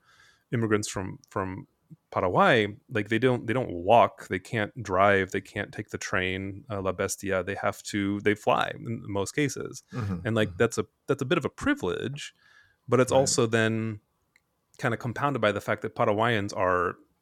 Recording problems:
none

